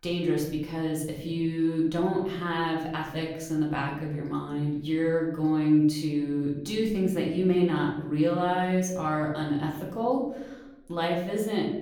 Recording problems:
off-mic speech; far
room echo; slight; dies away in 0.7 s

